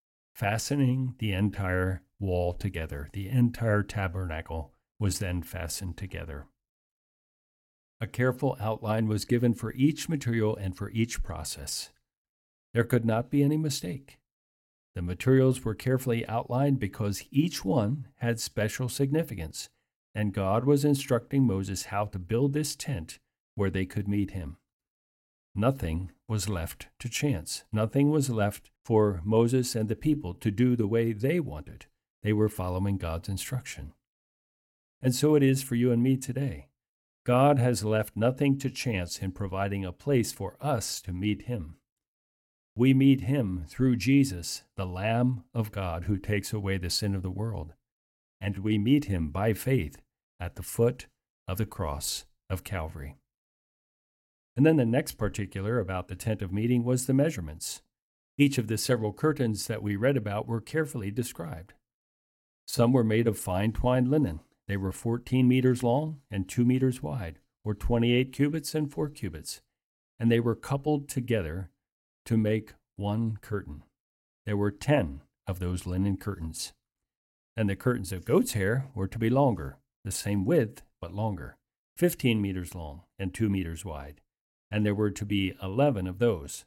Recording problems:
none

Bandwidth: 16.5 kHz